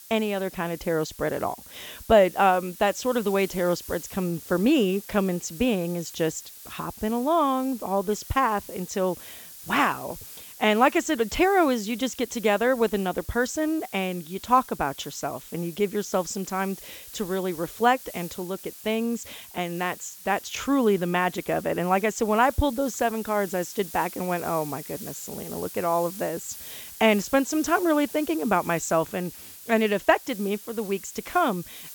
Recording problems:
high frequencies cut off; noticeable; nothing above 8 kHz
hiss; noticeable; throughout; 15 dB below the speech

